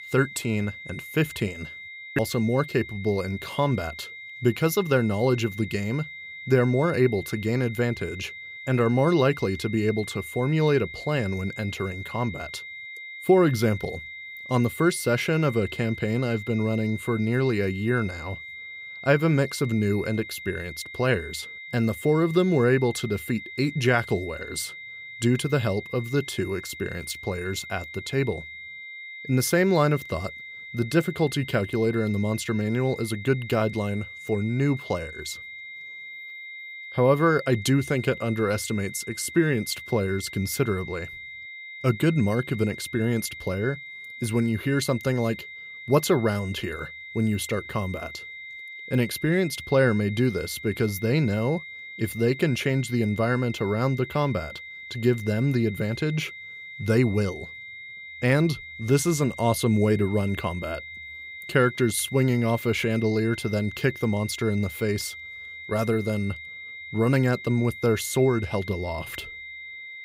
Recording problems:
high-pitched whine; noticeable; throughout; 2 kHz, 10 dB below the speech

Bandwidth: 15.5 kHz